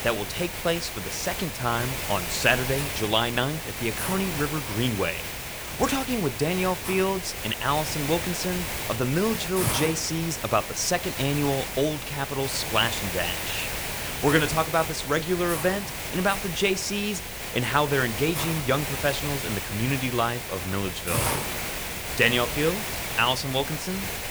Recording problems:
hiss; loud; throughout; 4 dB below the speech

